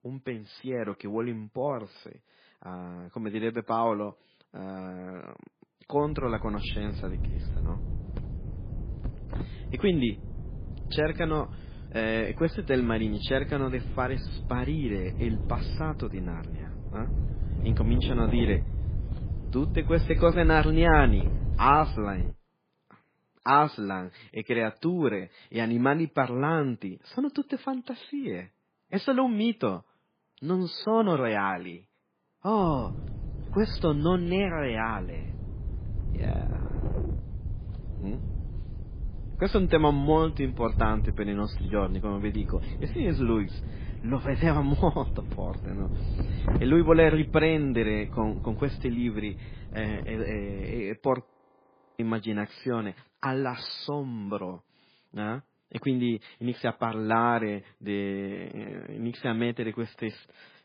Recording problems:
garbled, watery; badly
wind noise on the microphone; occasional gusts; from 6 to 22 s and from 33 to 51 s; 15 dB below the speech
audio freezing; at 51 s for 0.5 s

